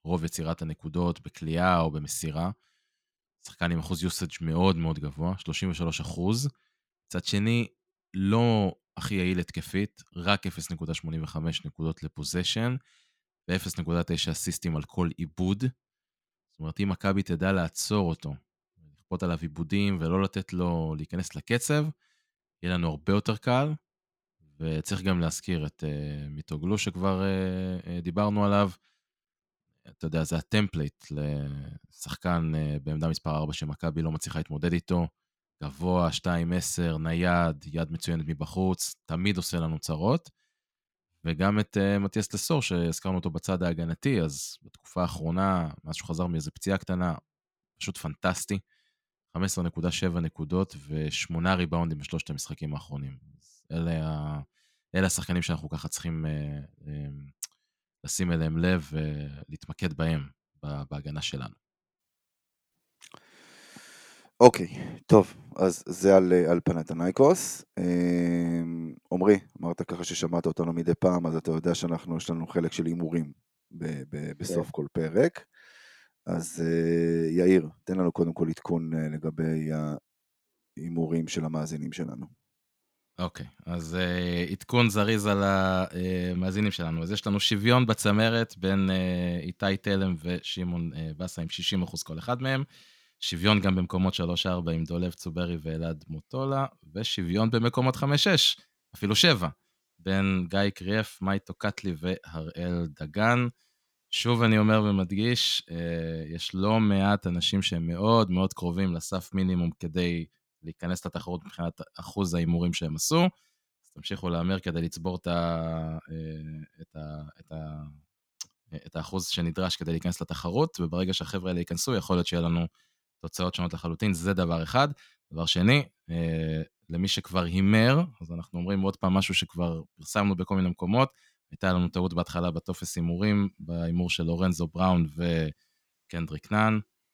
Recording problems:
none

